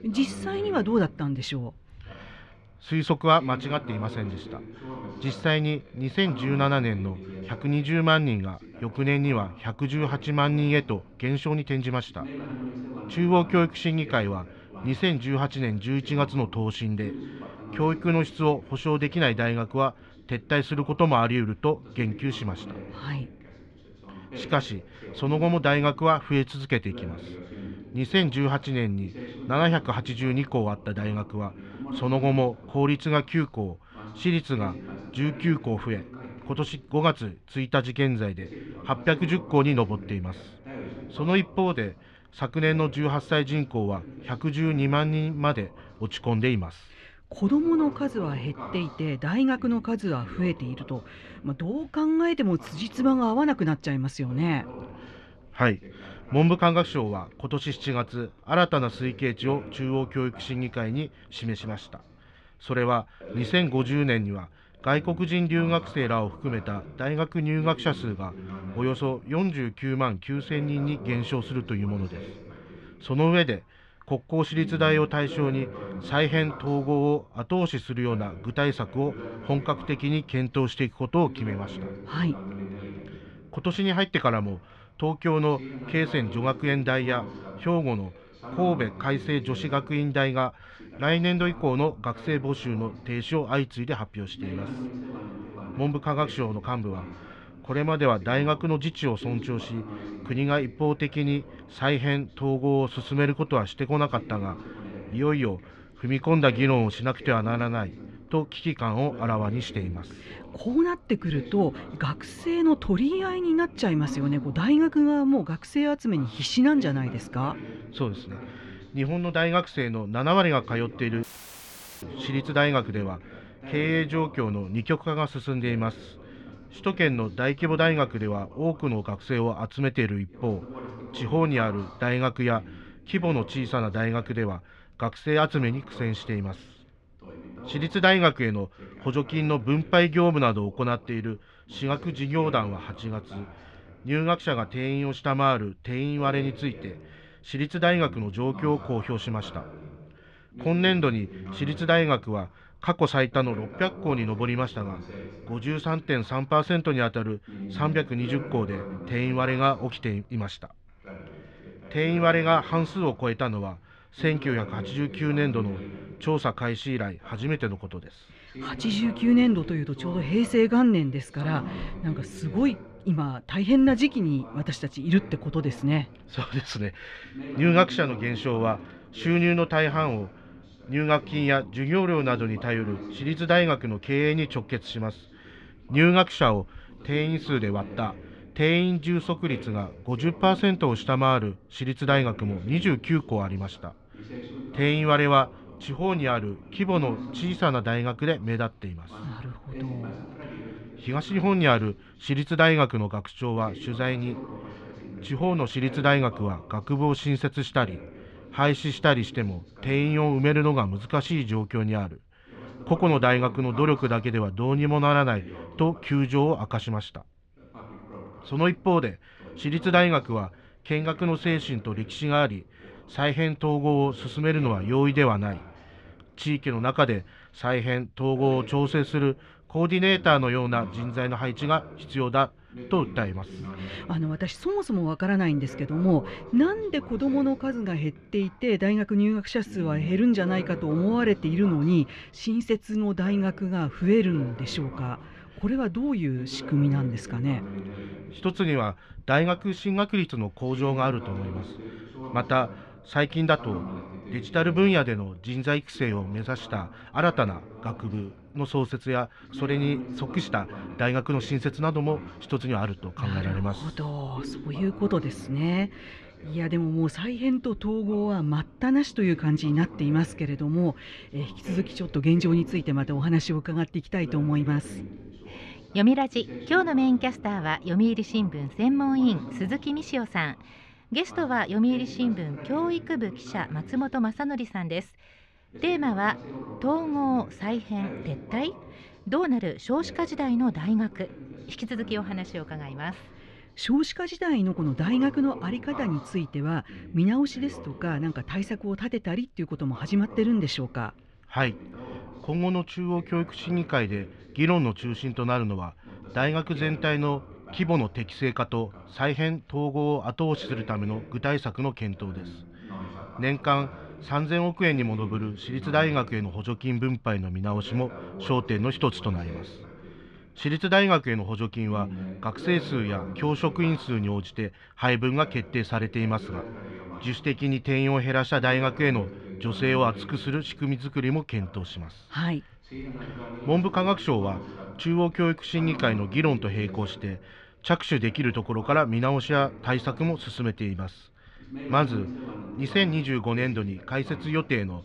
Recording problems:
muffled; slightly; fading above 3 kHz
voice in the background; noticeable; throughout; 15 dB below the speech
audio cutting out; filled with static; at 2:01 for 1 s

